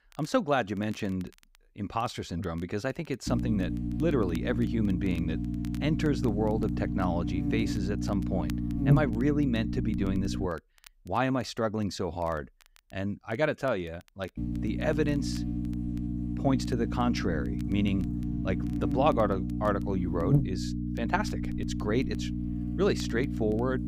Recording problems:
electrical hum; loud; from 3.5 to 10 s and from 14 s on; 60 Hz, 6 dB below the speech
crackle, like an old record; faint; 25 dB below the speech

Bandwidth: 15.5 kHz